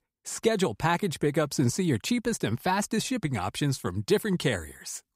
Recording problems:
none

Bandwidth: 15.5 kHz